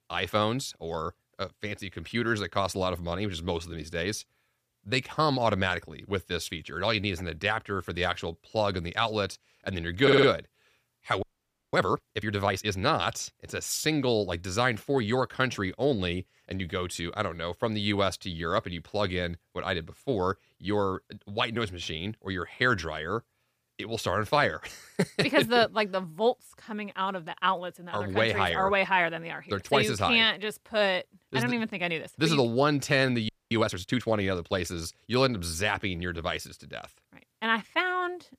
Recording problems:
audio stuttering; at 10 s
audio freezing; at 11 s for 0.5 s and at 33 s

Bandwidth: 15 kHz